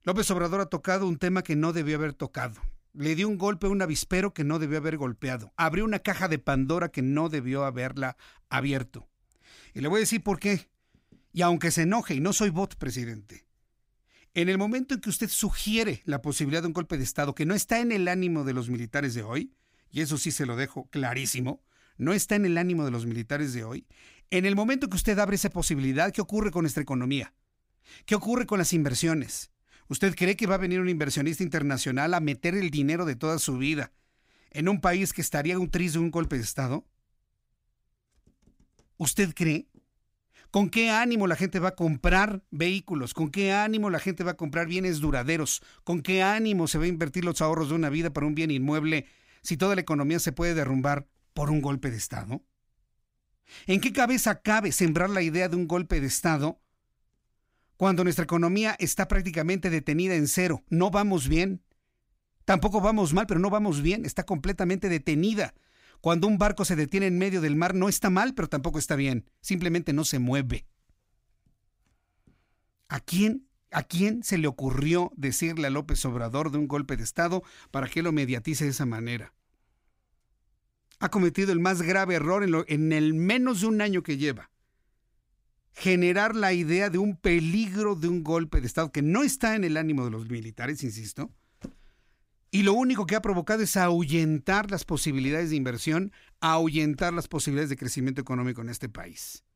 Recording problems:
none

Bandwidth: 15.5 kHz